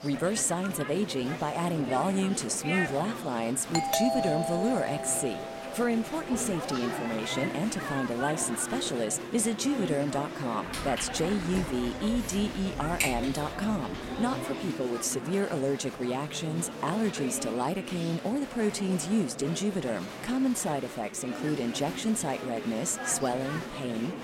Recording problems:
murmuring crowd; loud; throughout; 7 dB below the speech
doorbell; loud; from 4 to 6 s; peak 3 dB above the speech
footsteps; loud; from 11 to 14 s; peak 1 dB above the speech

